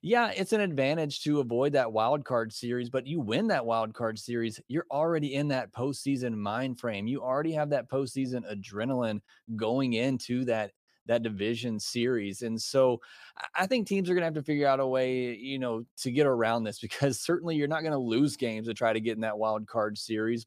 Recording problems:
none

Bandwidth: 15 kHz